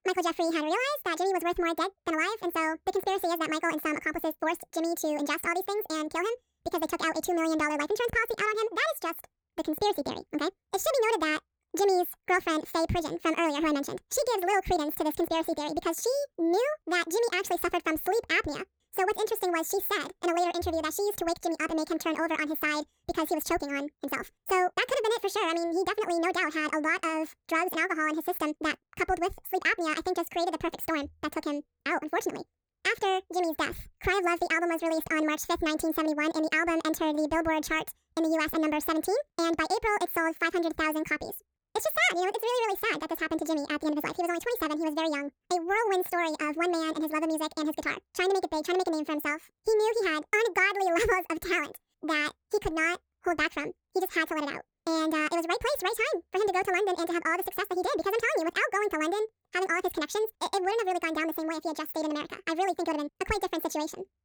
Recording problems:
wrong speed and pitch; too fast and too high; 1.7 times normal speed

